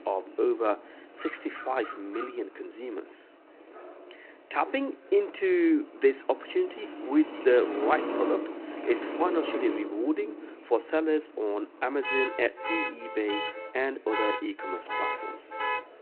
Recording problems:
phone-call audio
traffic noise; loud; throughout; 5 dB below the speech
chatter from many people; faint; throughout; 25 dB below the speech

